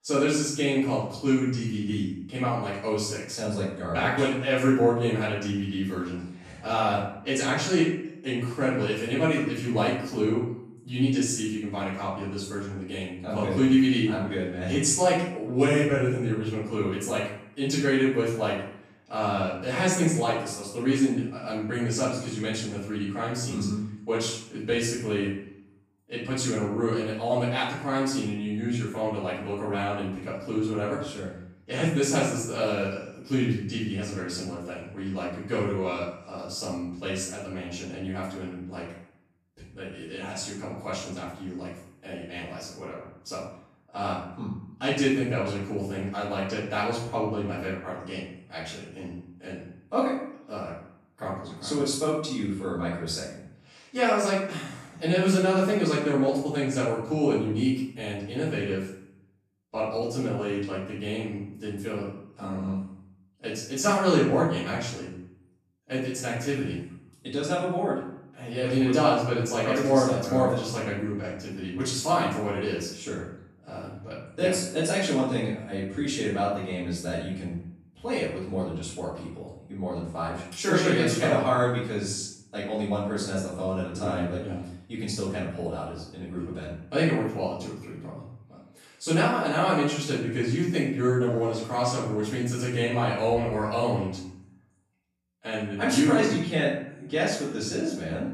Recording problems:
off-mic speech; far
room echo; noticeable; dies away in 0.6 s

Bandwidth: 14.5 kHz